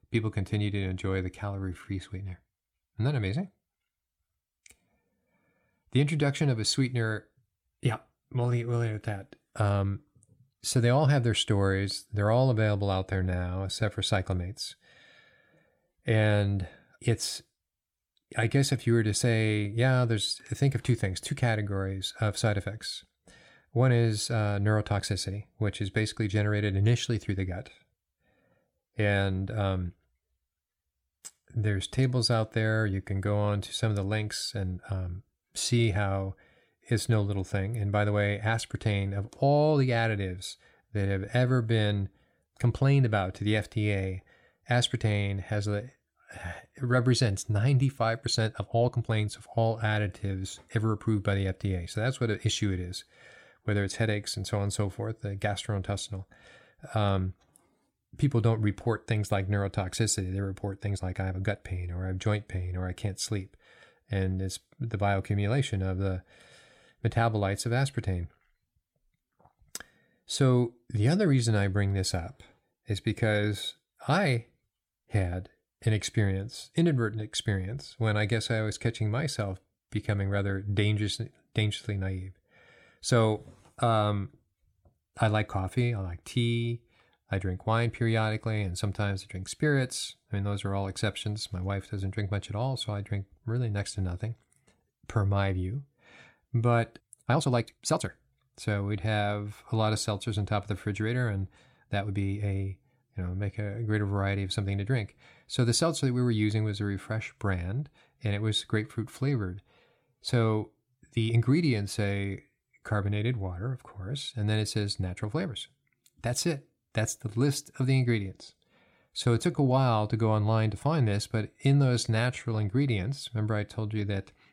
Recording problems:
uneven, jittery; strongly; from 1.5 s to 2:03

